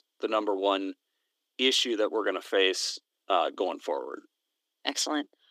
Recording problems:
thin; somewhat; fading below 300 Hz

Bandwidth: 15 kHz